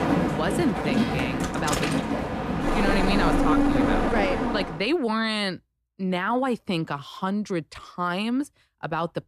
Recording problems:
train or aircraft noise; very loud; until 4.5 s; 3 dB above the speech
uneven, jittery; strongly; from 1 to 8 s

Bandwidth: 14.5 kHz